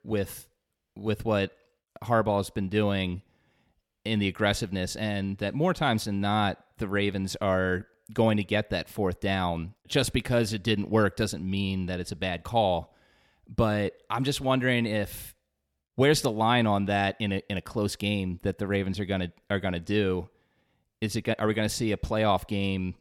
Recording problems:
none

